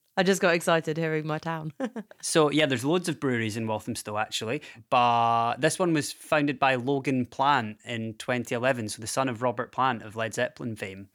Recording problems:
none

